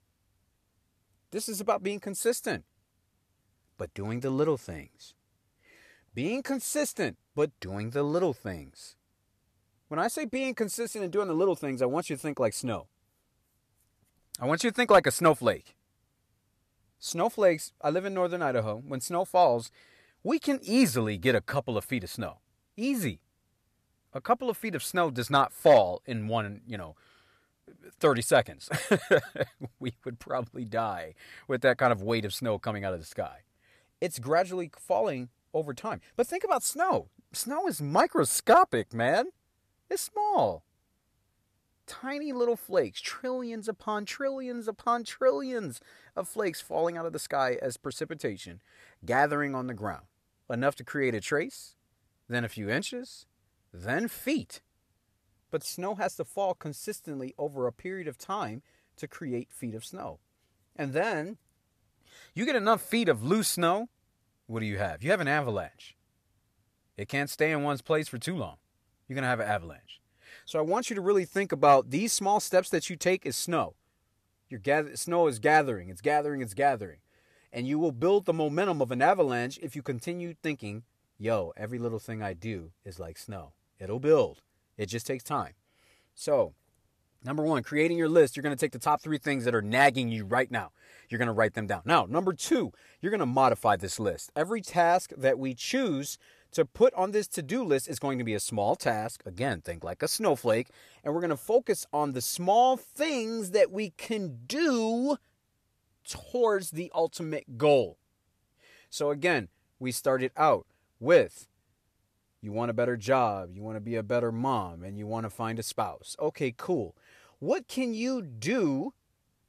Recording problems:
none

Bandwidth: 14.5 kHz